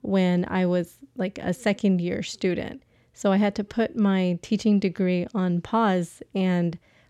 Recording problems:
none

